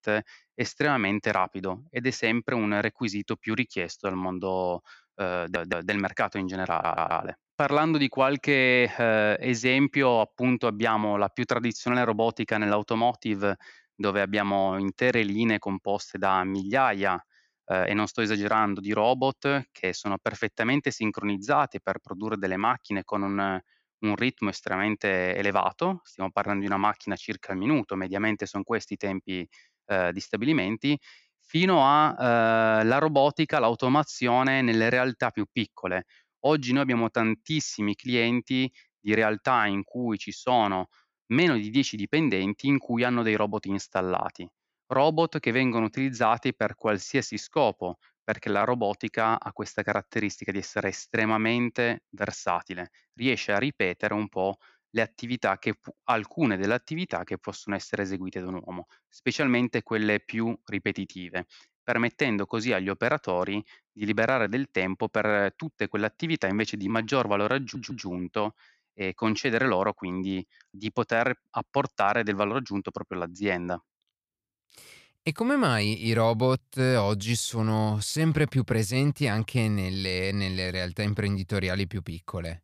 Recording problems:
audio stuttering; at 5.5 s, at 6.5 s and at 1:08

